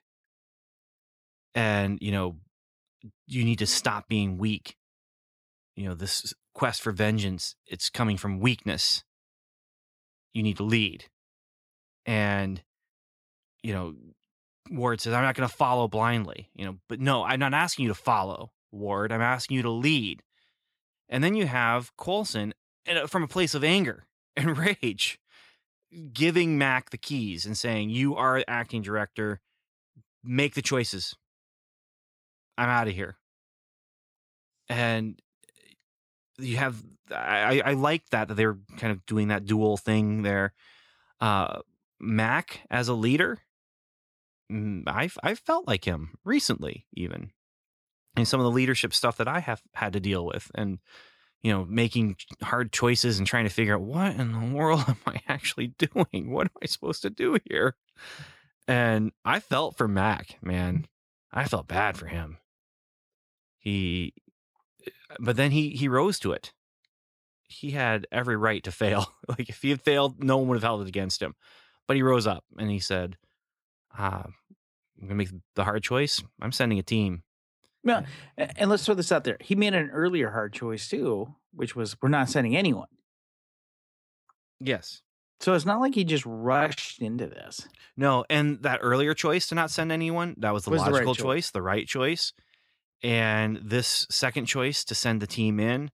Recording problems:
none

